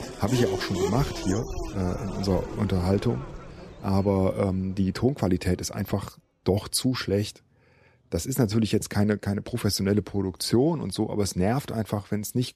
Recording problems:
traffic noise; loud; throughout; 8 dB below the speech

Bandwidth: 14 kHz